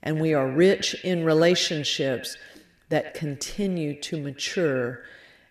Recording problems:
echo of what is said; noticeable; throughout; 100 ms later, 15 dB below the speech

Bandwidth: 14.5 kHz